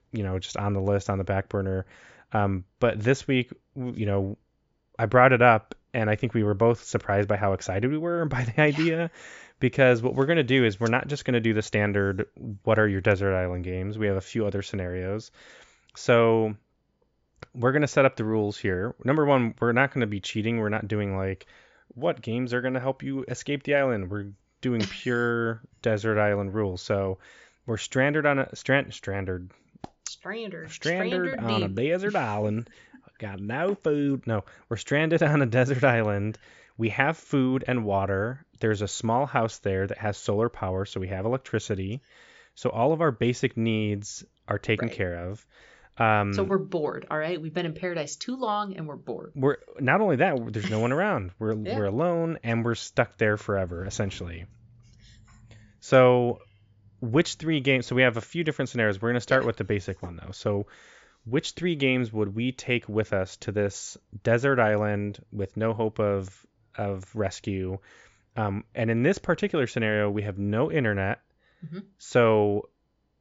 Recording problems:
high frequencies cut off; noticeable; nothing above 7.5 kHz

